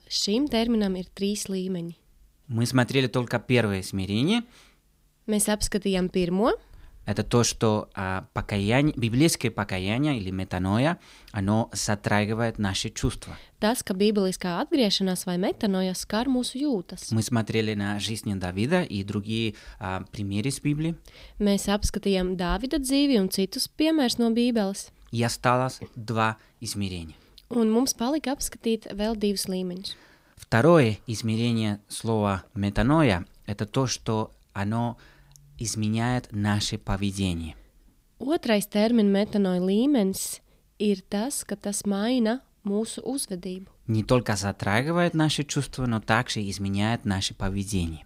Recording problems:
none

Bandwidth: 15.5 kHz